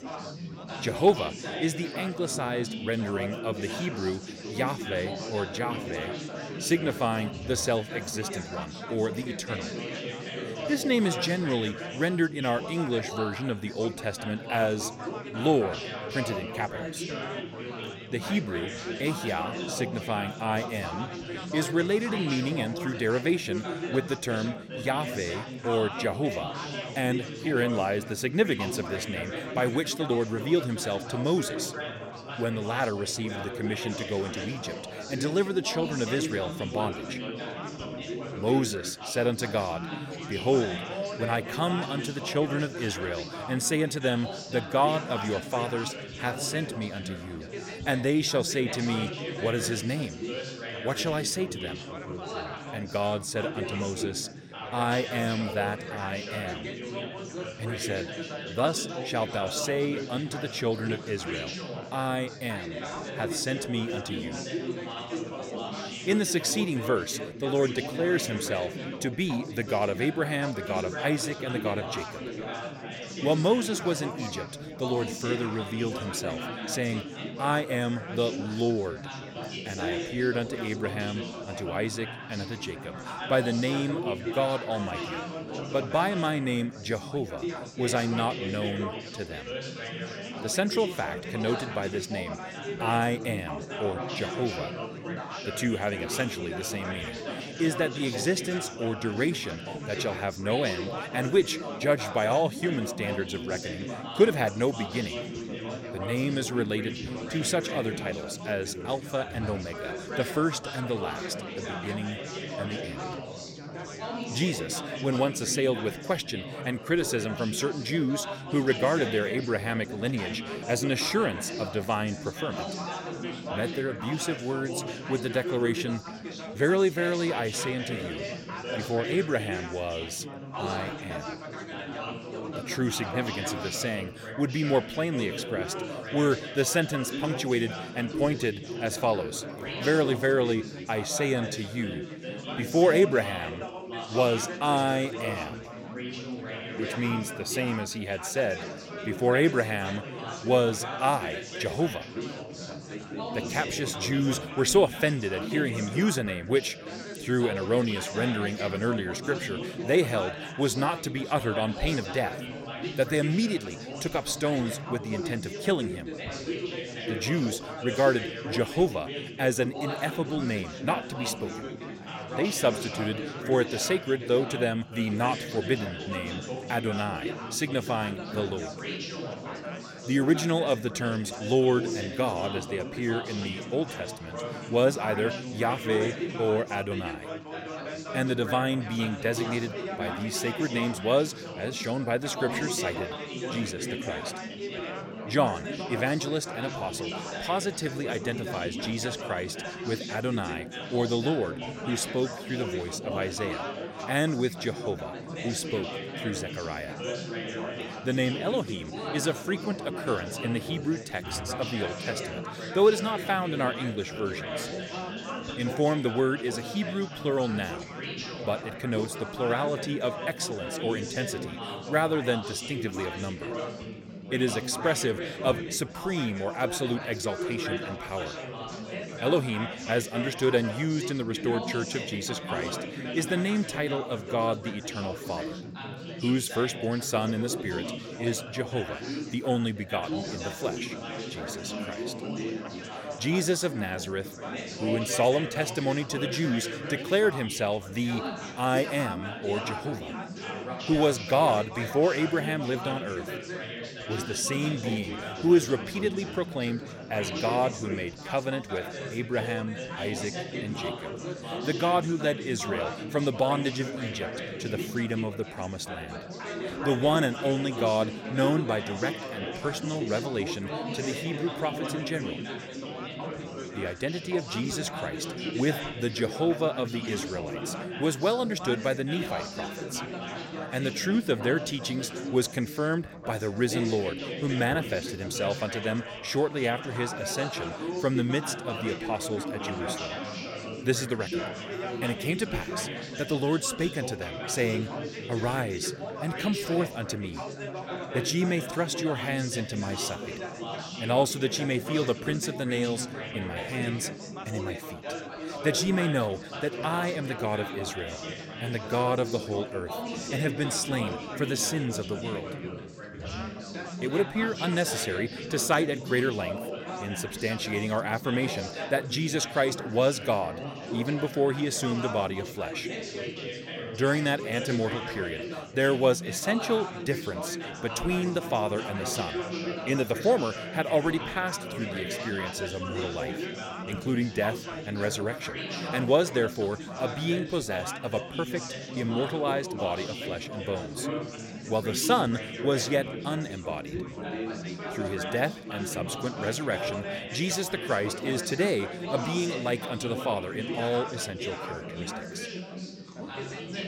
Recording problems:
chatter from many people; loud; throughout; 6 dB below the speech

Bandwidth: 16.5 kHz